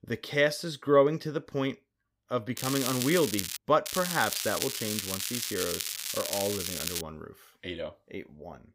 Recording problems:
crackling; loud; at 2.5 s and from 4 to 7 s; 2 dB below the speech

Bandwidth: 15.5 kHz